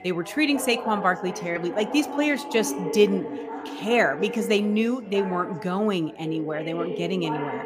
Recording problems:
background chatter; loud; throughout; 3 voices, 9 dB below the speech

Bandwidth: 15 kHz